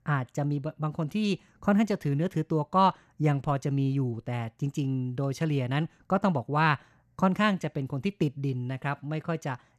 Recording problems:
none

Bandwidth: 14 kHz